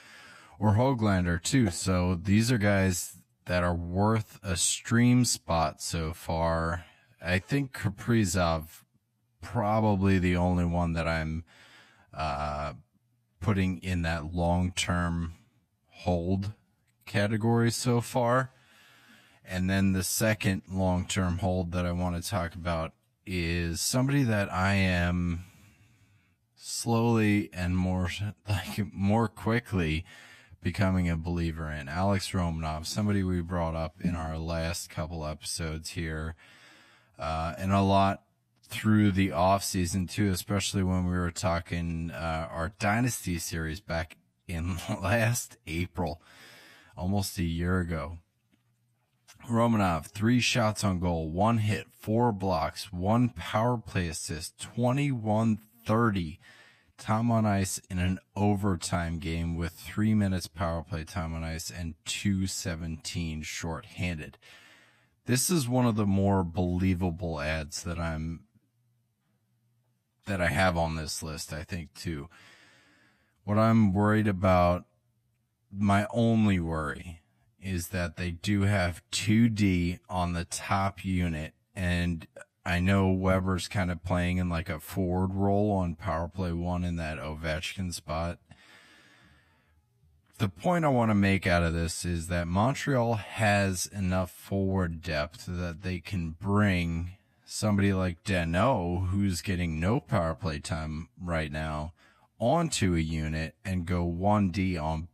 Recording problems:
wrong speed, natural pitch; too slow; 0.6 times normal speed

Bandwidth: 14.5 kHz